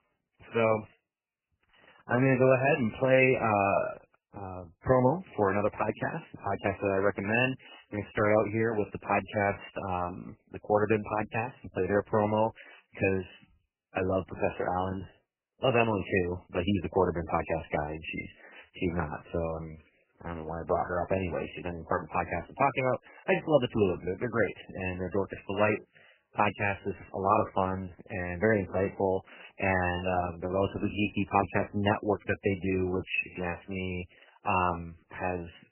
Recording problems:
garbled, watery; badly; nothing above 3 kHz

